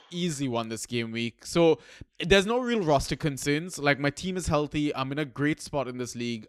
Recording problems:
none

